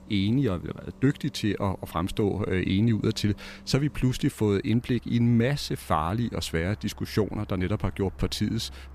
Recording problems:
traffic noise; faint; throughout; 20 dB below the speech

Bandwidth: 14.5 kHz